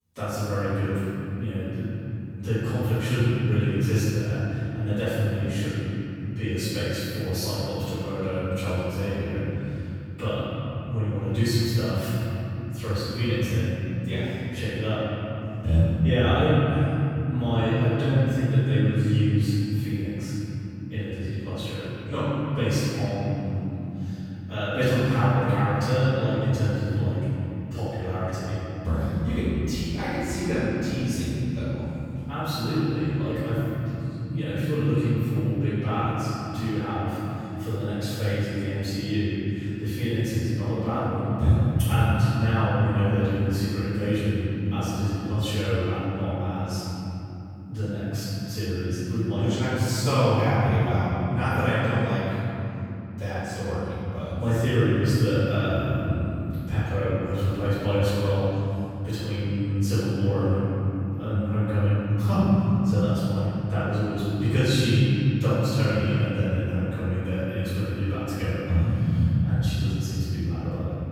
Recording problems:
room echo; strong; dies away in 3 s
off-mic speech; far

